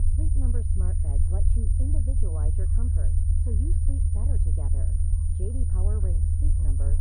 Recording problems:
muffled; very; fading above 2 kHz
low rumble; very loud; throughout; 2 dB above the speech
high-pitched whine; loud; throughout; 9.5 kHz, 5 dB below the speech
animal sounds; faint; throughout; 25 dB below the speech

